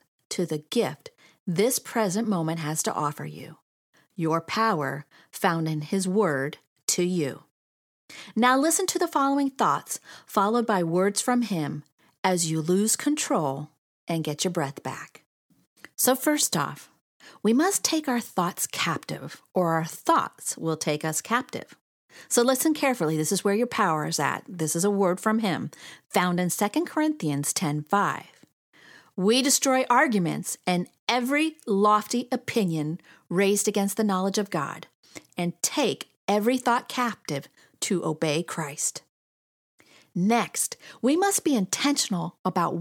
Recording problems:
abrupt cut into speech; at the end

